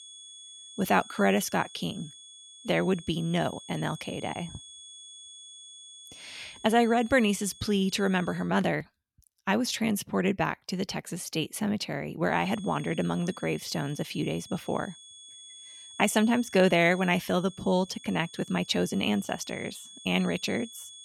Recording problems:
high-pitched whine; noticeable; until 8.5 s and from 12 s on; 3.5 kHz, 20 dB below the speech

